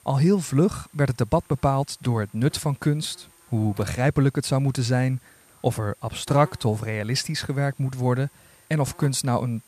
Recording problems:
electrical hum; faint; throughout; 60 Hz, 25 dB below the speech

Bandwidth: 14.5 kHz